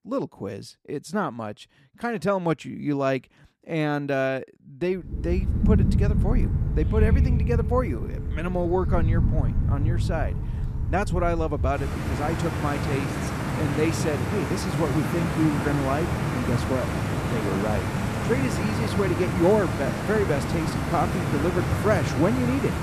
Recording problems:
rain or running water; very loud; from 5 s on; 1 dB above the speech

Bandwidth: 14.5 kHz